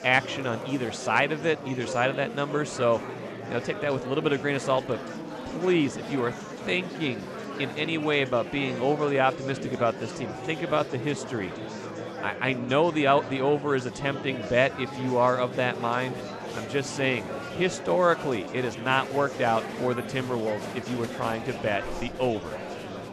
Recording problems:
murmuring crowd; loud; throughout; 9 dB below the speech

